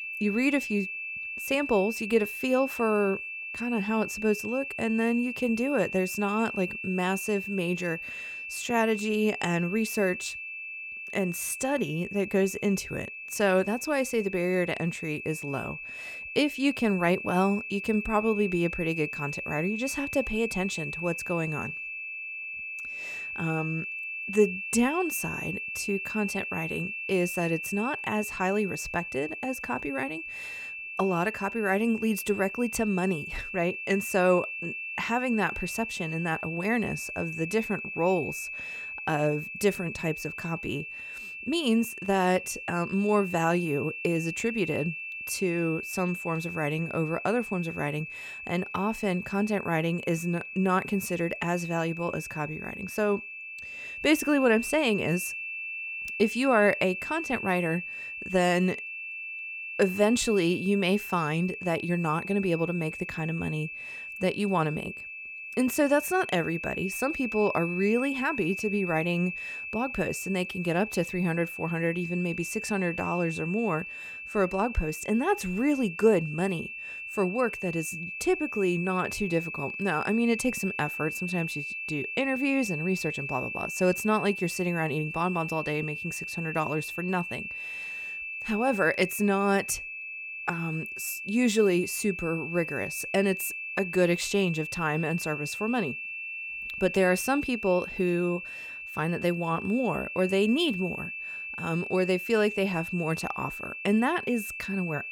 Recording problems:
high-pitched whine; loud; throughout; 2.5 kHz, 6 dB below the speech

